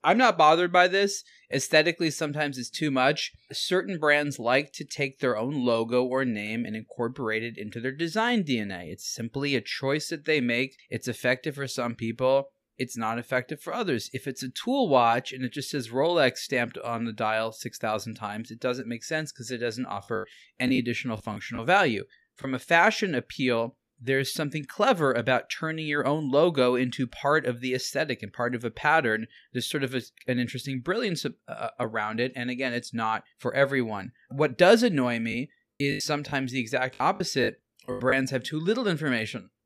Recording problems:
choppy; very; from 20 to 22 s and from 35 to 38 s; 15% of the speech affected

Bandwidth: 14.5 kHz